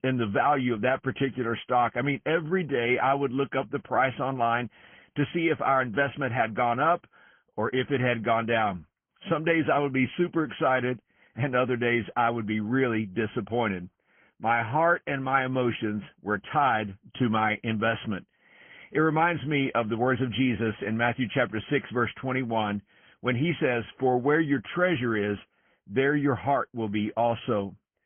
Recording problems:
high frequencies cut off; severe; nothing above 3 kHz
garbled, watery; slightly

